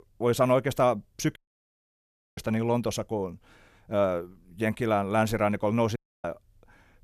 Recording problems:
audio cutting out; at 1.5 s for 1 s and at 6 s

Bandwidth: 13.5 kHz